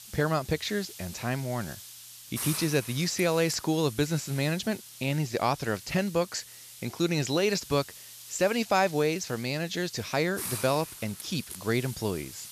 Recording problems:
high frequencies cut off; noticeable; nothing above 8 kHz
hiss; noticeable; throughout; 10 dB below the speech

